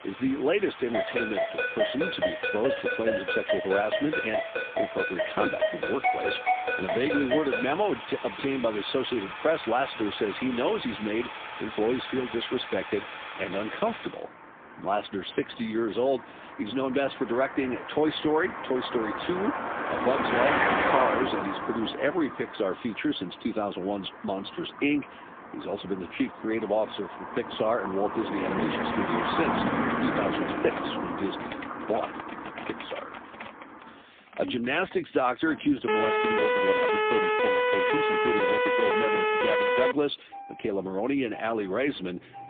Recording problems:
phone-call audio; poor line; nothing above 3.5 kHz
traffic noise; loud; throughout; 4 dB below the speech
phone ringing; loud; from 1 to 7.5 s; peak 3 dB above the speech
keyboard typing; faint; from 28 to 35 s; peak 10 dB below the speech
siren; loud; from 36 to 40 s; peak 6 dB above the speech

